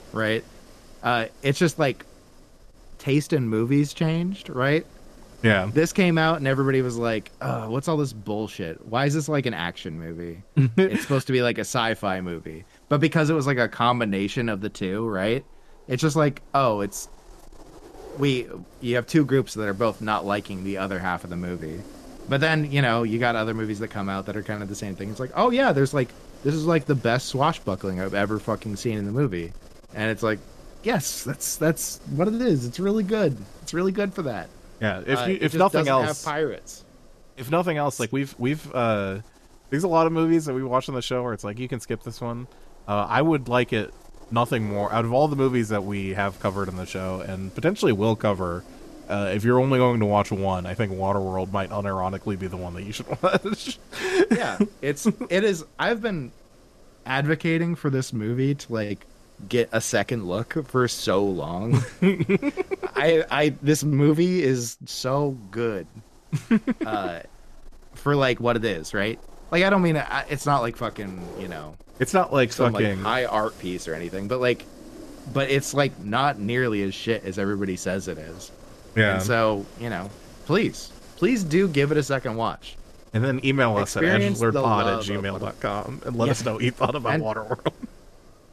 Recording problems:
wind noise on the microphone; occasional gusts; 25 dB below the speech

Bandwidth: 13.5 kHz